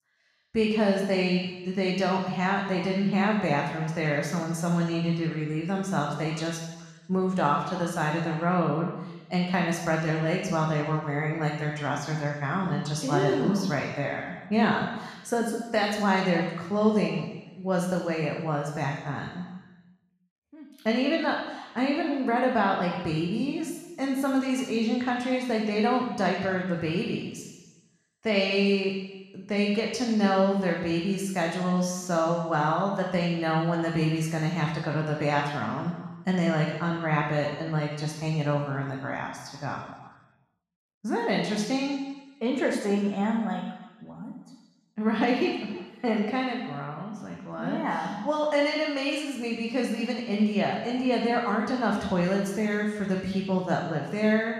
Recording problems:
off-mic speech; far
room echo; noticeable; dies away in 1.2 s

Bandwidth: 14 kHz